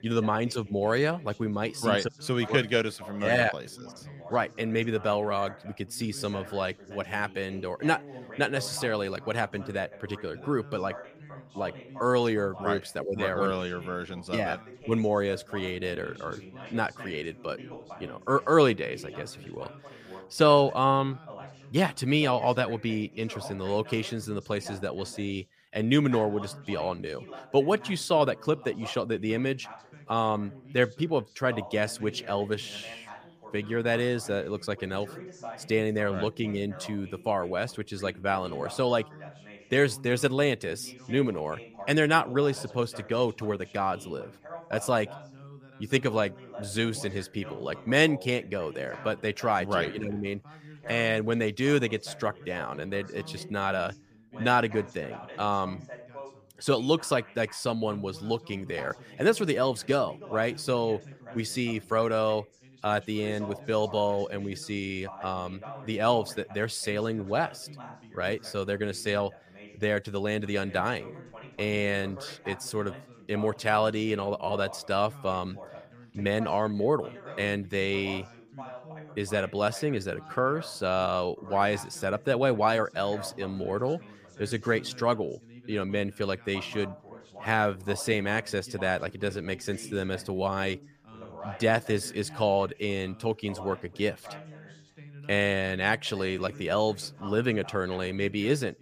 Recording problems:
background chatter; noticeable; throughout; 2 voices, 15 dB below the speech

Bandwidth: 15 kHz